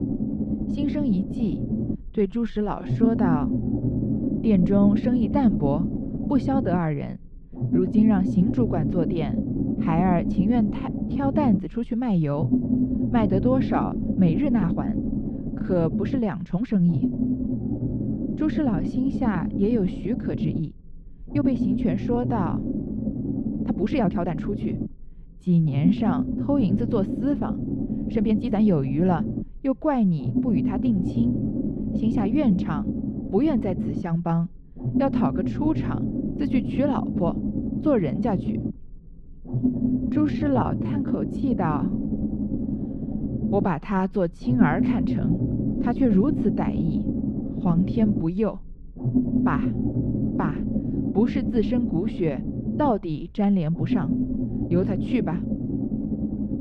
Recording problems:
muffled; slightly; fading above 2.5 kHz
low rumble; loud; throughout; 4 dB below the speech
uneven, jittery; strongly; from 2 to 54 s

